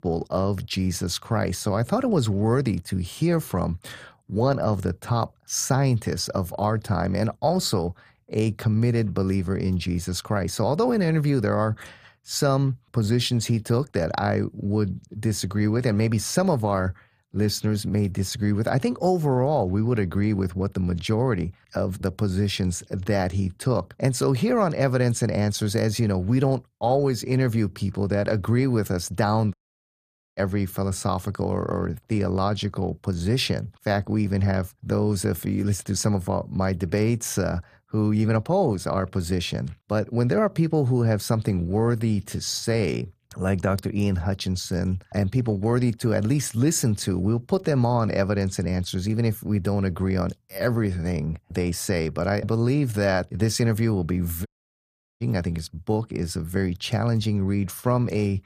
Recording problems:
audio cutting out; at 30 s for 1 s and at 54 s for 0.5 s

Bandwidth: 15 kHz